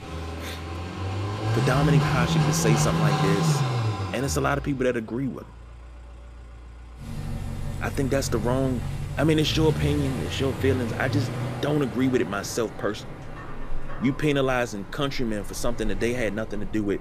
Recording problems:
traffic noise; loud; throughout; 2 dB below the speech

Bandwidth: 14.5 kHz